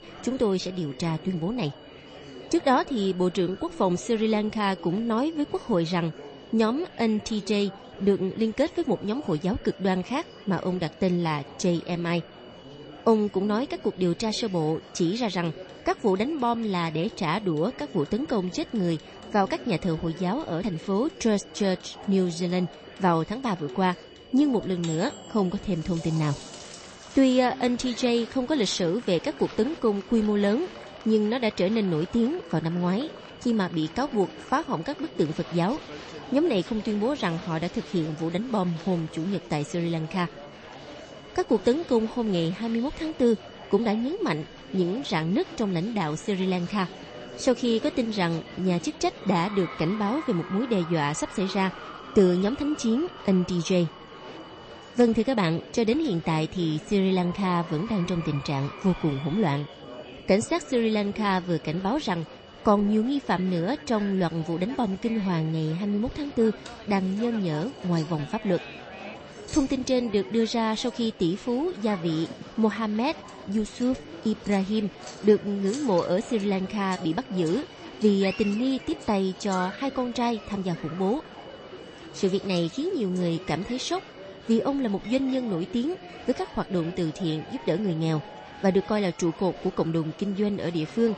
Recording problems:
garbled, watery; slightly; nothing above 8 kHz
murmuring crowd; noticeable; throughout; 15 dB below the speech
high-pitched whine; faint; throughout; 3 kHz, 25 dB below the speech
household noises; faint; throughout; 25 dB below the speech

